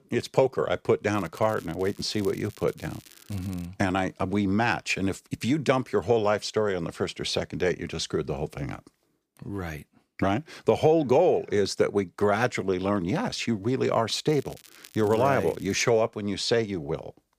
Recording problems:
crackling; faint; from 1 to 3.5 s and from 14 to 16 s; 25 dB below the speech

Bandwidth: 15 kHz